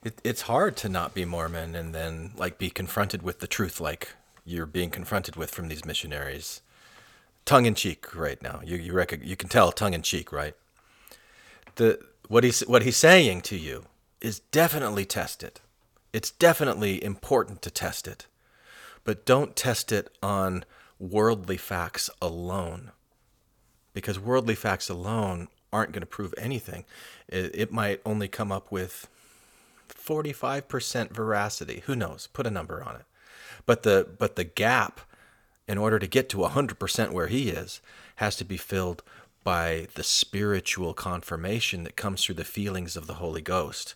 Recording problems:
none

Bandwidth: 18.5 kHz